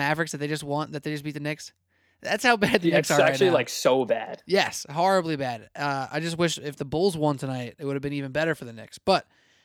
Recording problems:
abrupt cut into speech; at the start

